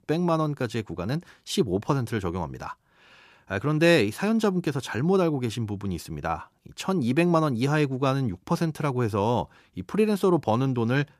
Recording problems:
none

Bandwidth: 14.5 kHz